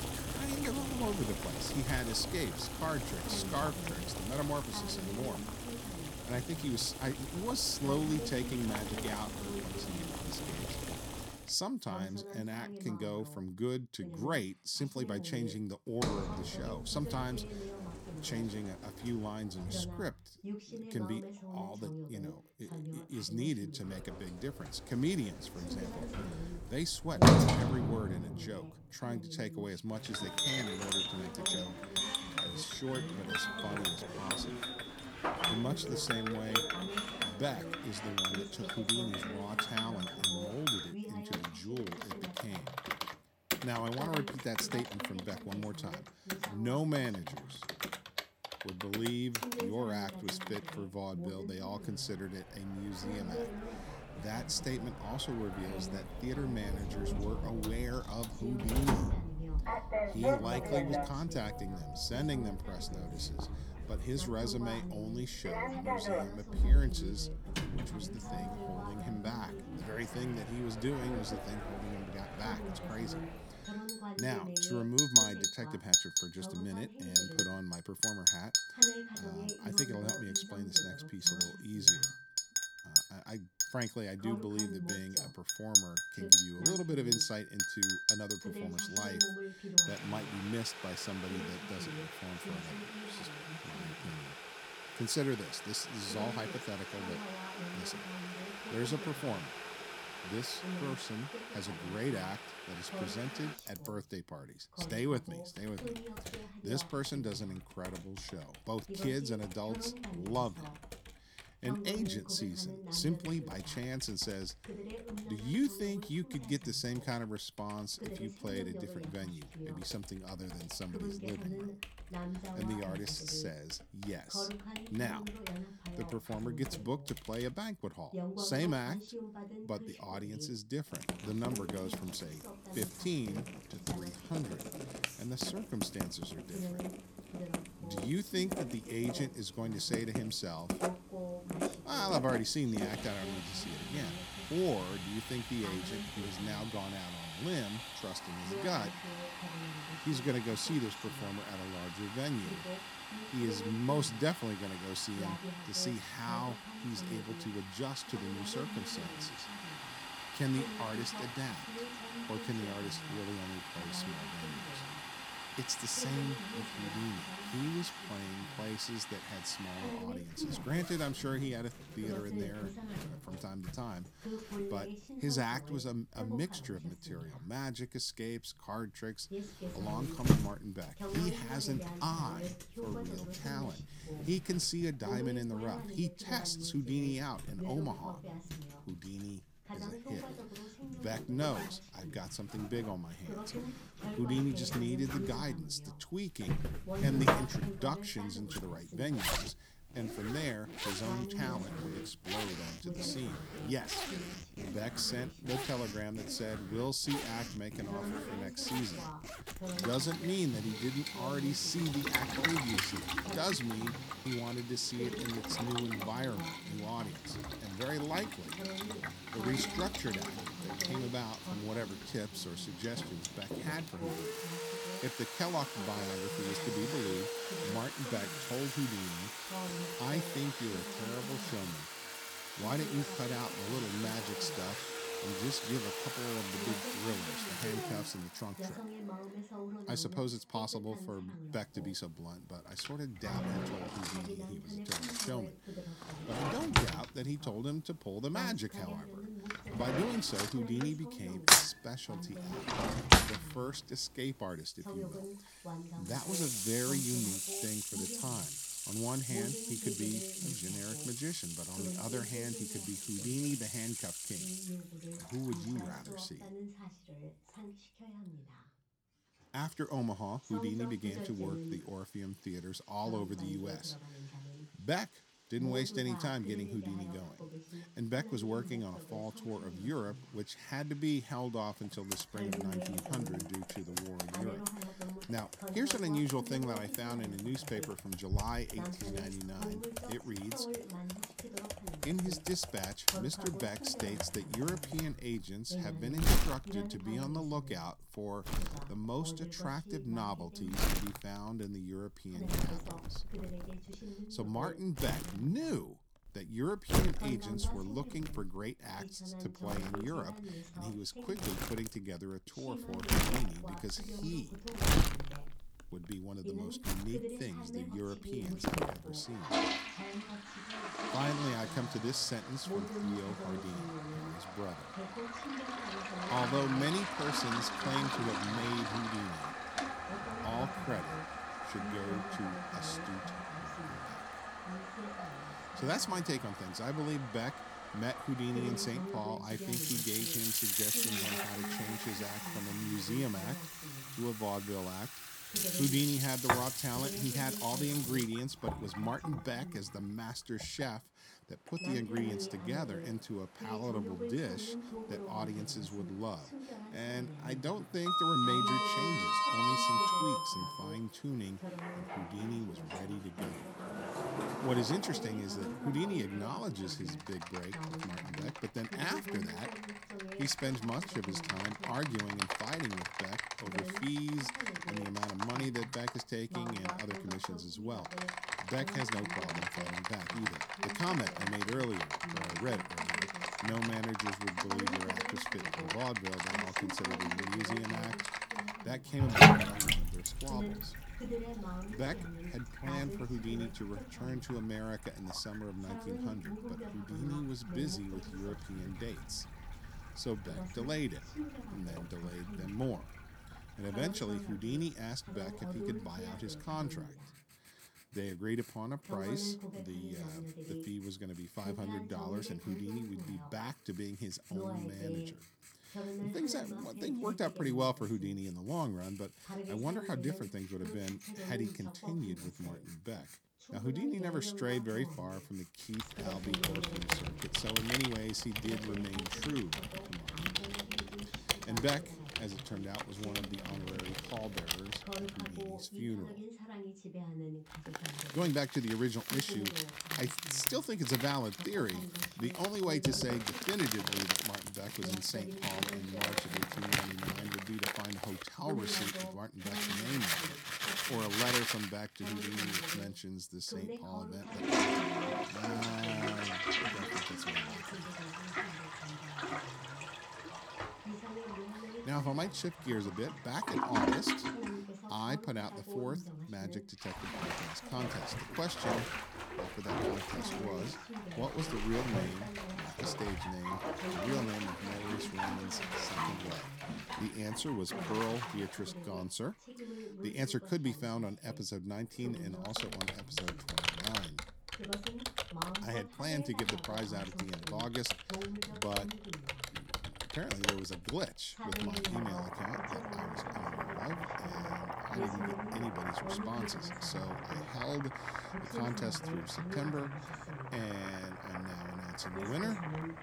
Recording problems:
household noises; very loud; throughout; 3 dB above the speech
voice in the background; loud; throughout; 7 dB below the speech

